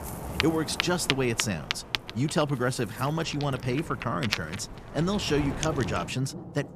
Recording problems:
rain or running water; loud; throughout; 5 dB below the speech

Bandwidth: 14.5 kHz